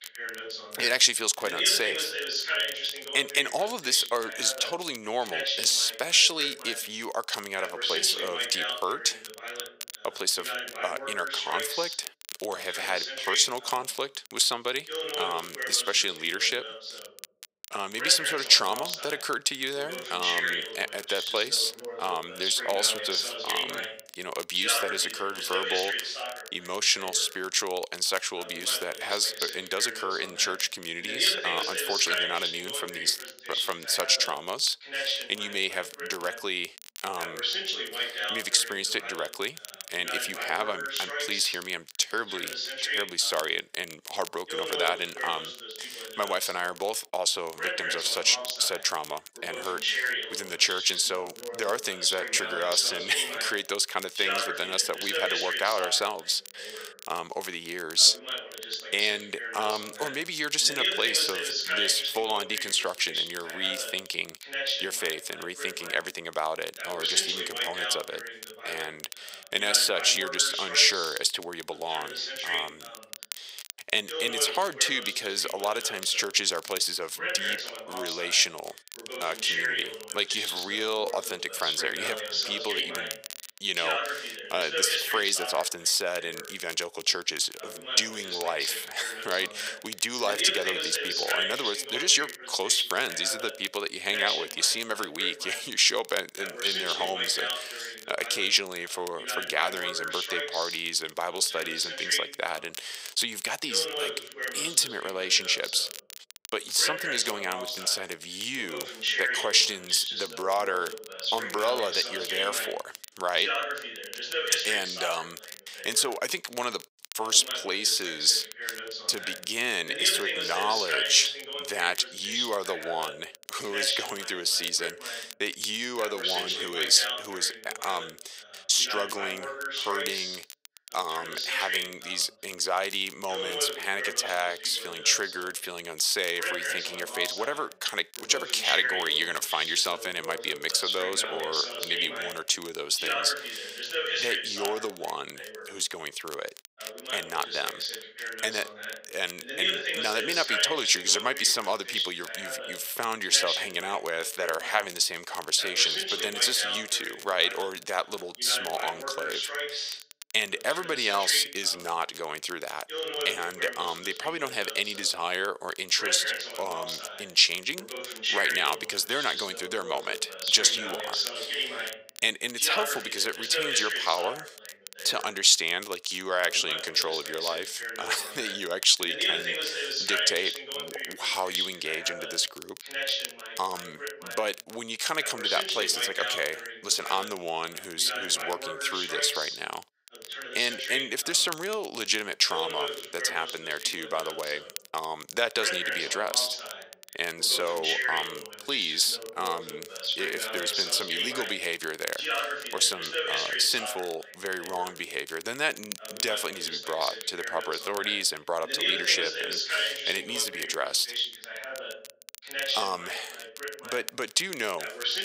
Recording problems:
thin; very; fading below 700 Hz
voice in the background; loud; throughout; 4 dB below the speech
crackle, like an old record; noticeable; 15 dB below the speech

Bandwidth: 15.5 kHz